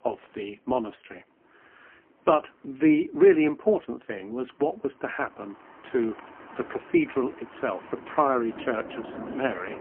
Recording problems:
phone-call audio; poor line; nothing above 3 kHz
traffic noise; noticeable; throughout; 15 dB below the speech

